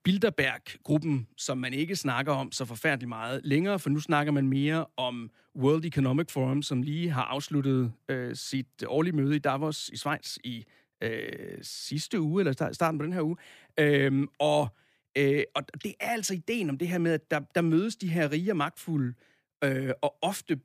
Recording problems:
none

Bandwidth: 15 kHz